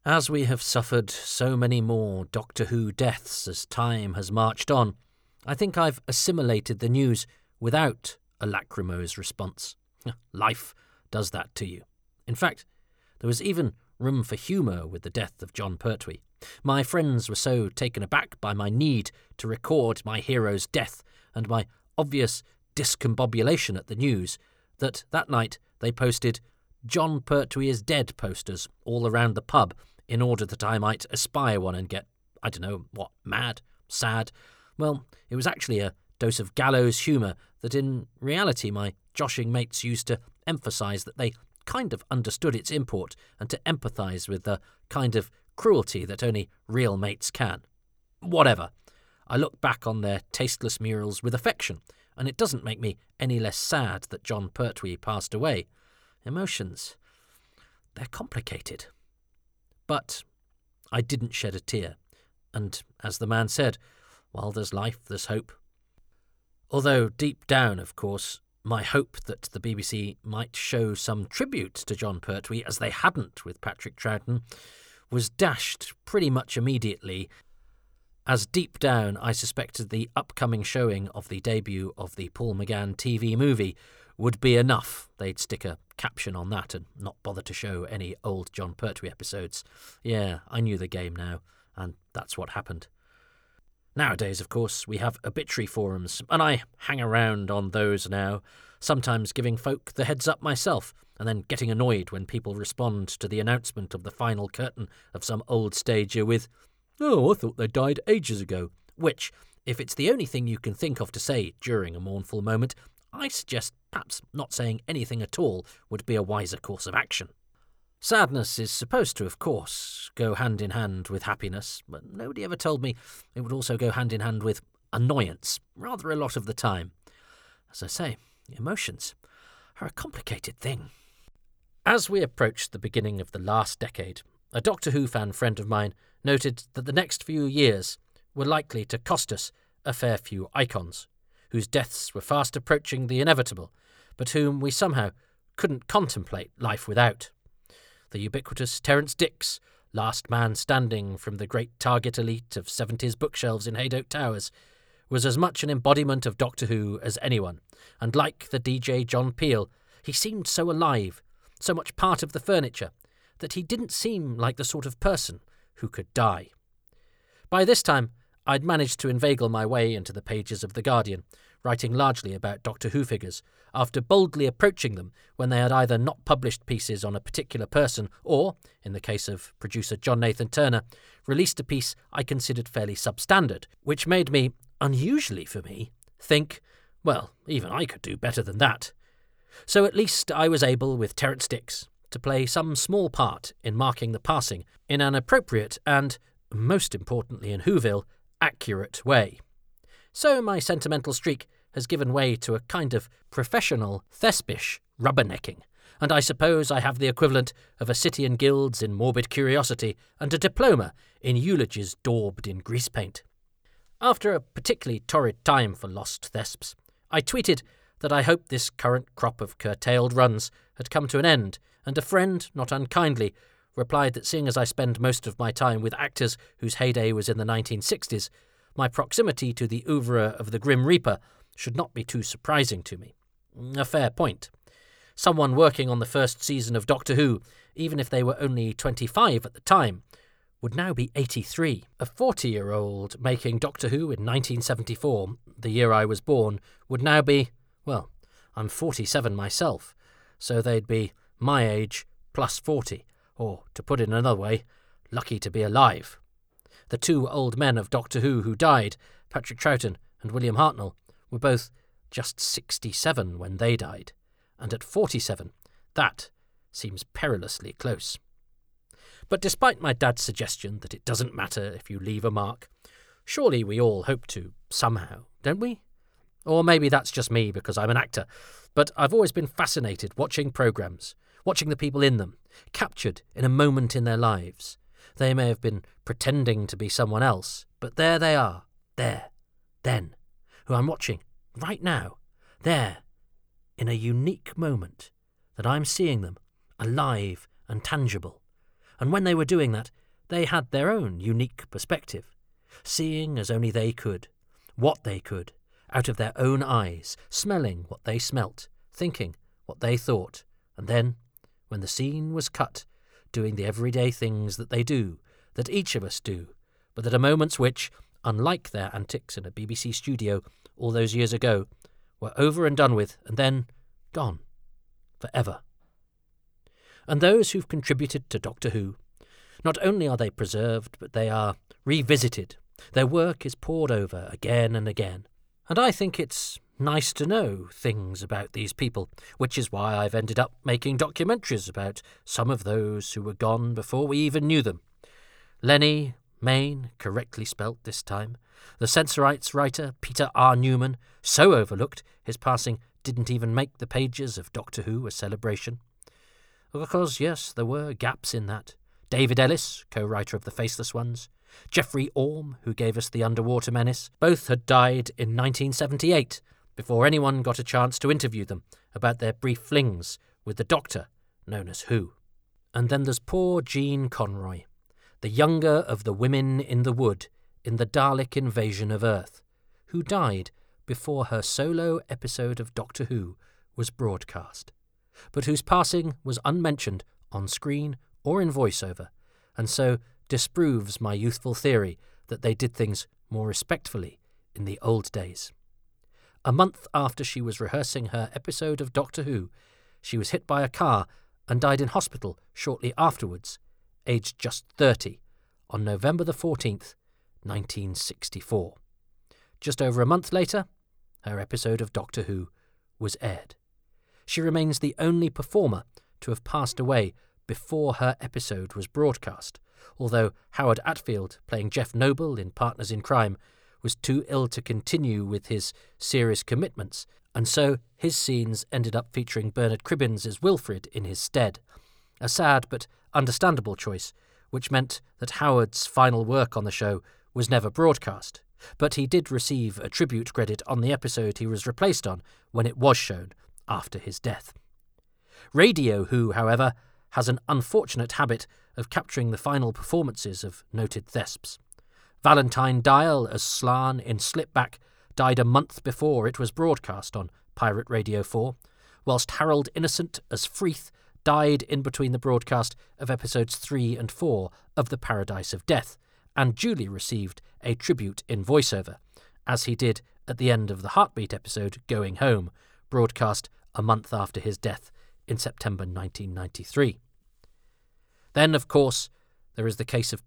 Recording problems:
none

